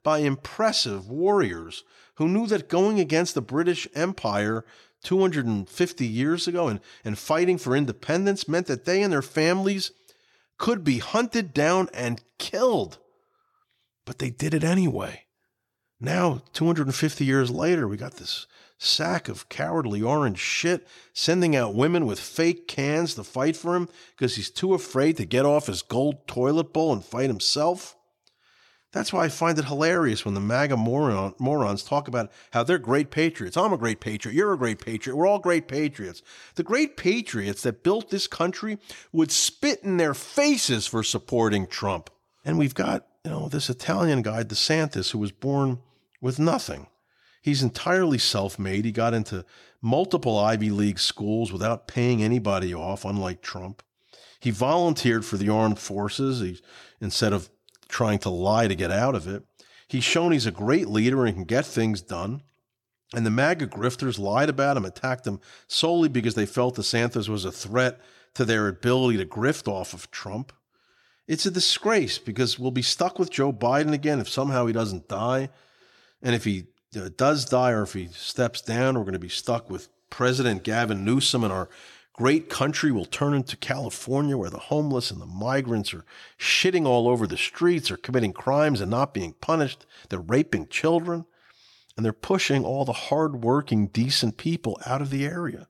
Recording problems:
none

